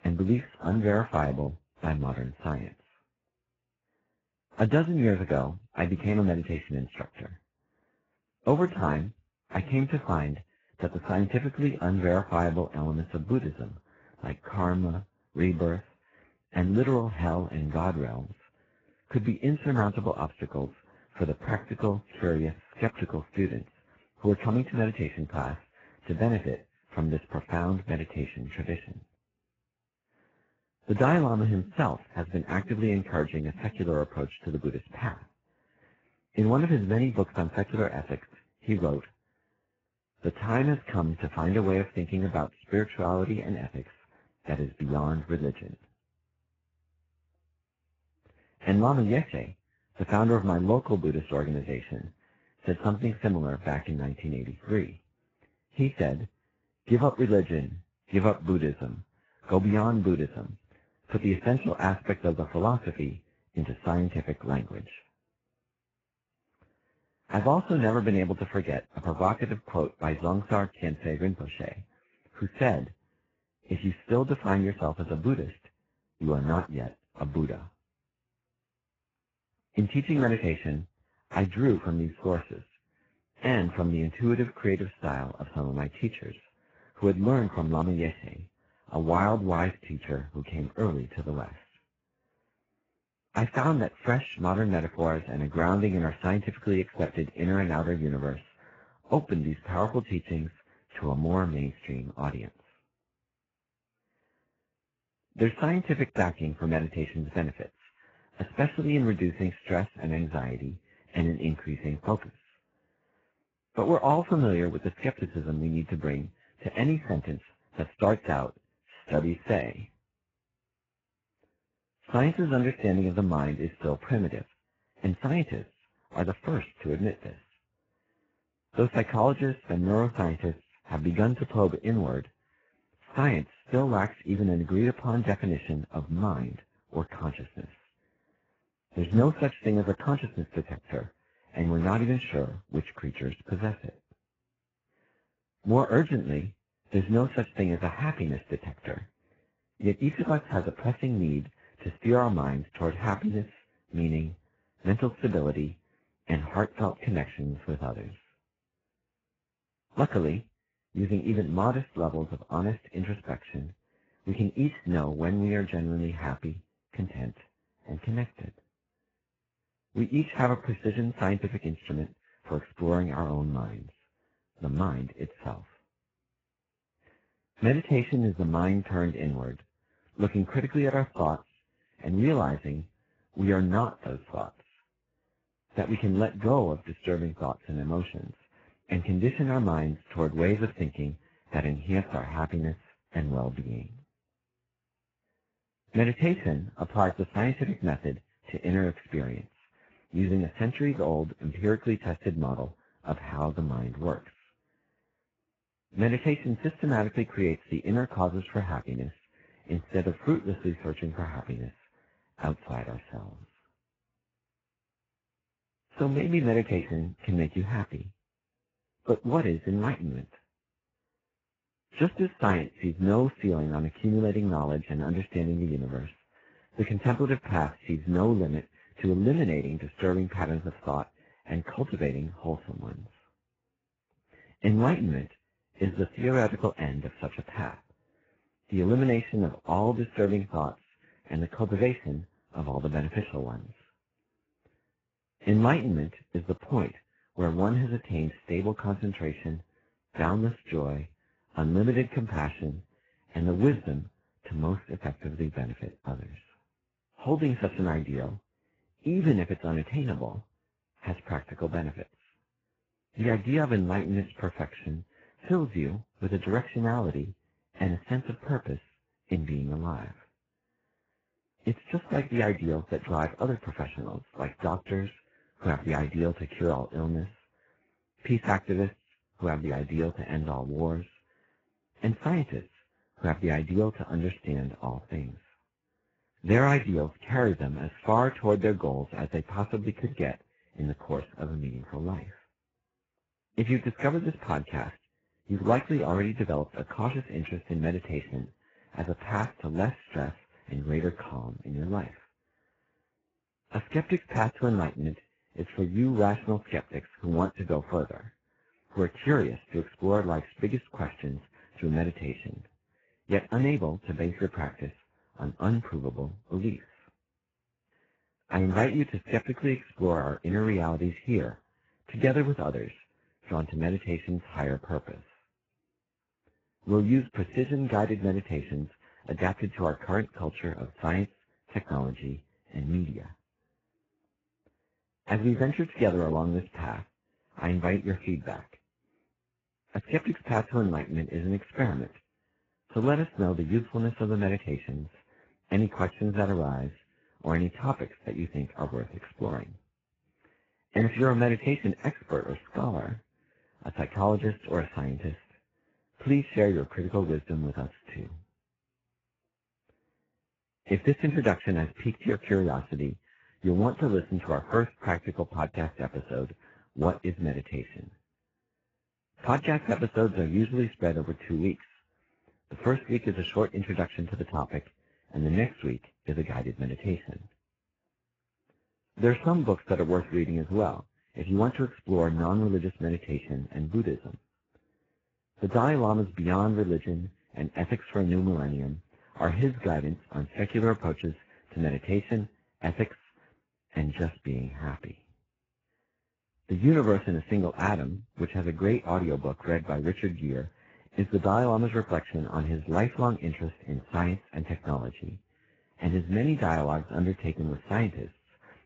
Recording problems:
garbled, watery; badly; nothing above 7.5 kHz

